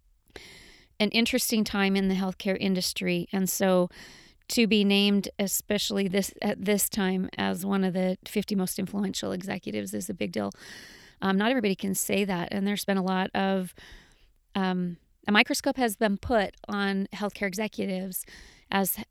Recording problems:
uneven, jittery; strongly; from 1 to 18 s

